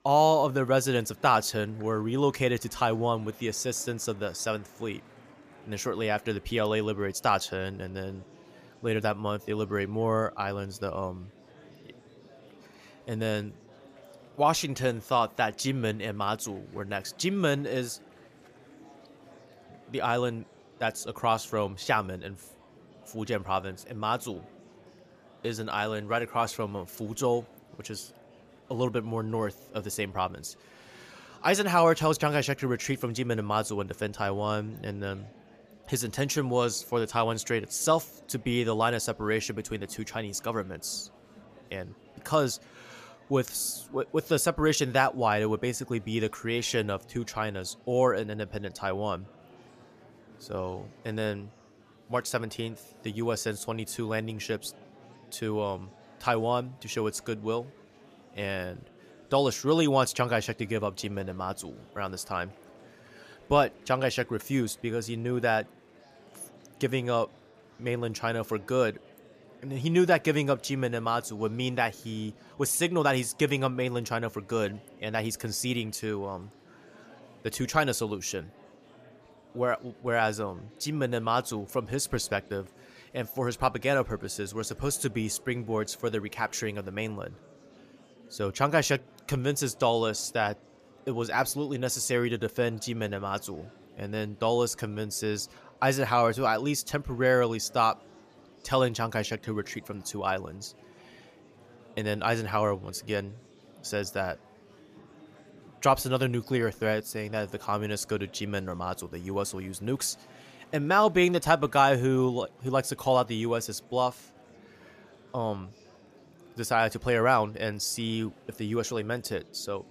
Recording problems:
murmuring crowd; faint; throughout; 25 dB below the speech

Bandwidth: 14.5 kHz